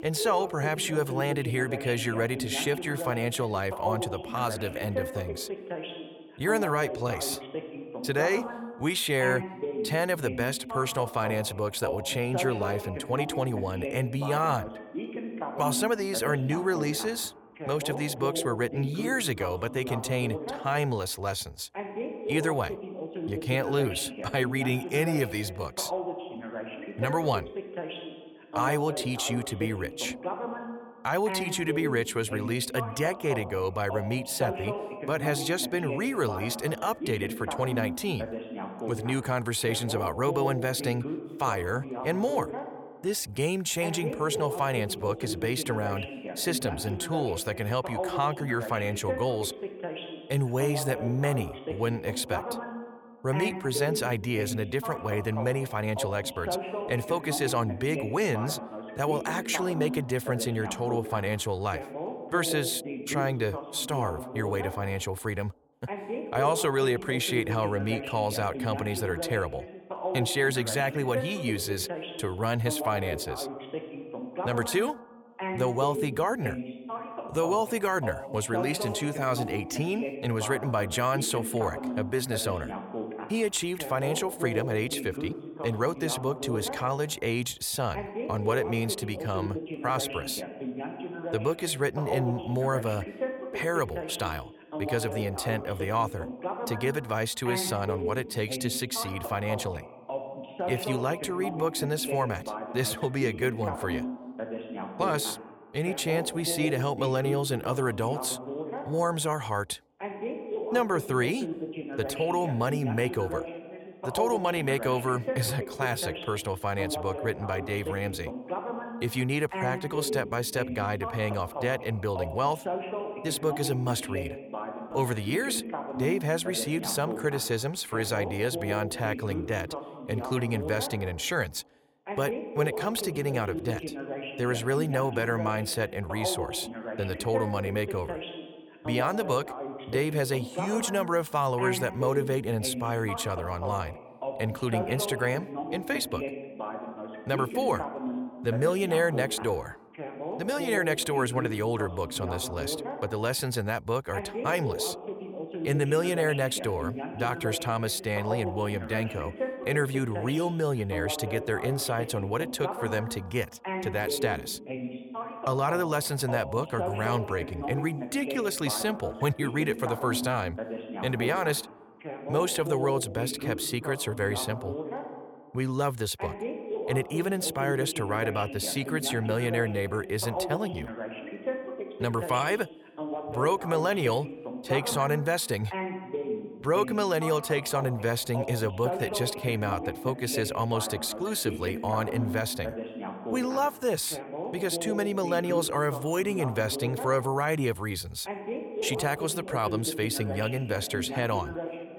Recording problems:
voice in the background; loud; throughout; 7 dB below the speech

